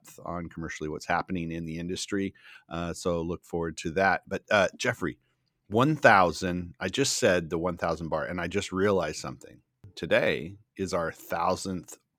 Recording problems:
none

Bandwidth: 18.5 kHz